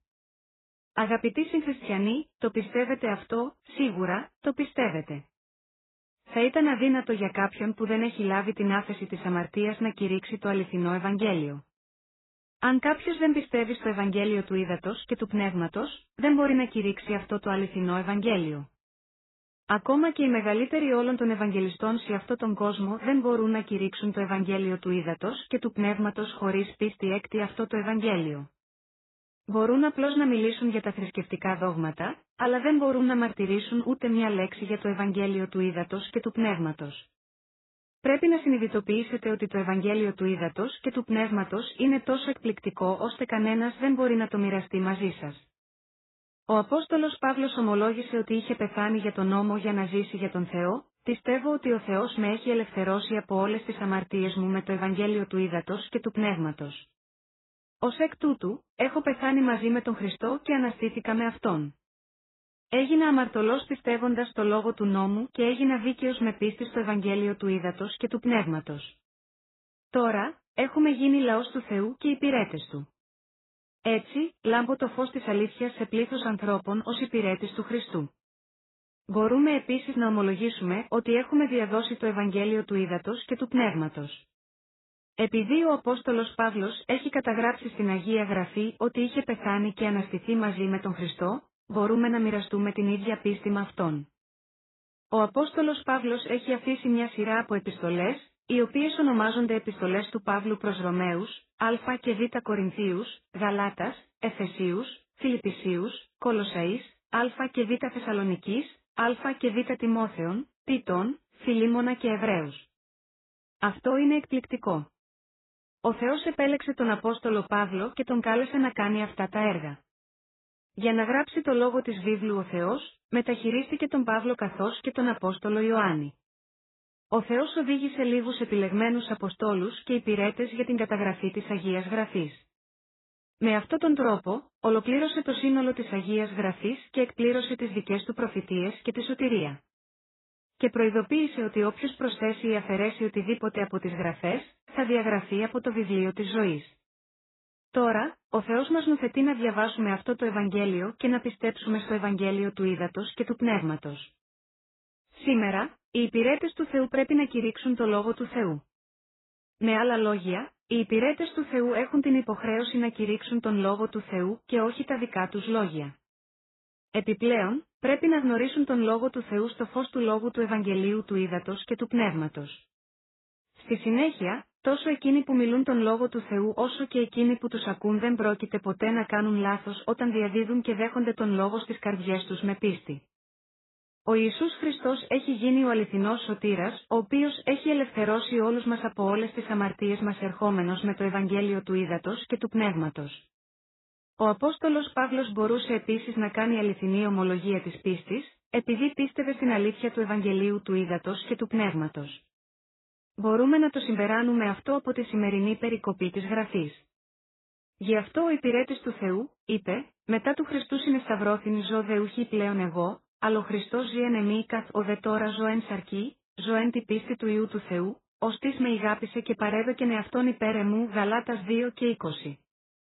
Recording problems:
garbled, watery; badly; nothing above 4 kHz

